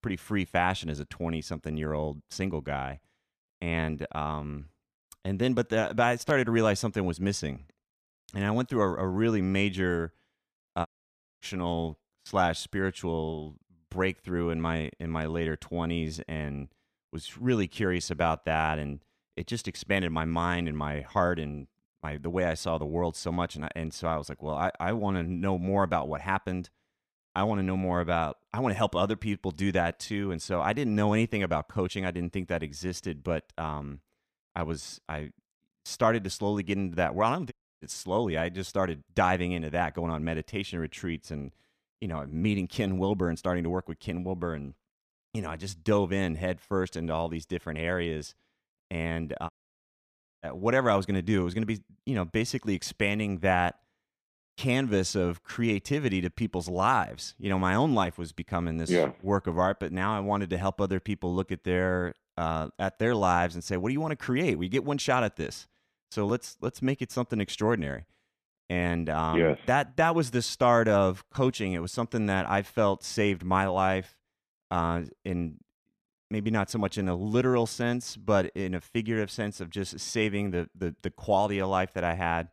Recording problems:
audio cutting out; at 11 s for 0.5 s, at 38 s and at 50 s for 1 s

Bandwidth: 14.5 kHz